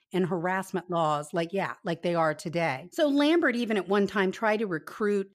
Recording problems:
none

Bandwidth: 14.5 kHz